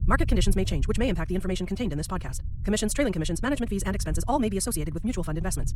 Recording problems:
wrong speed, natural pitch; too fast; 1.7 times normal speed
low rumble; faint; throughout; 20 dB below the speech

